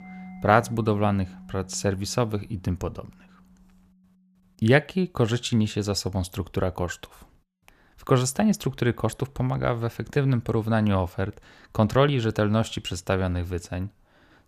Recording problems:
background music; faint; throughout; 20 dB below the speech

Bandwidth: 14.5 kHz